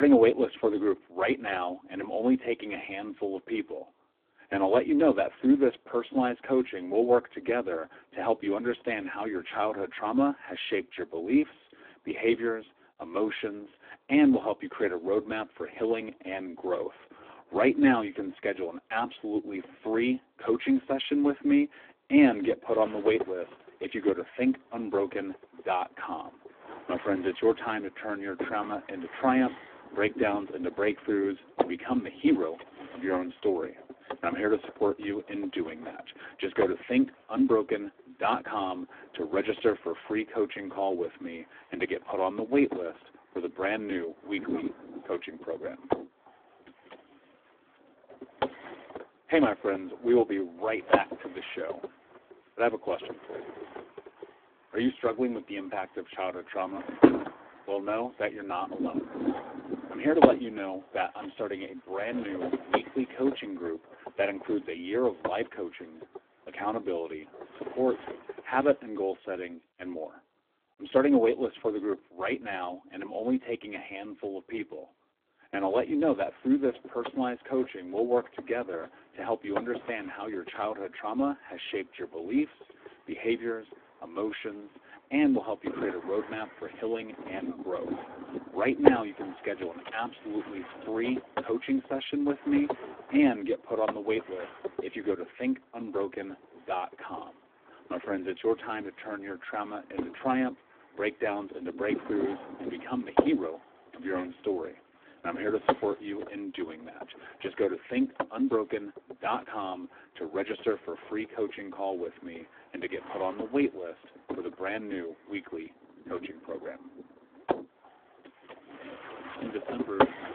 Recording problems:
phone-call audio; poor line
wind noise on the microphone; heavy; from 23 s to 1:09 and from 1:16 on; 3 dB below the speech
abrupt cut into speech; at the start

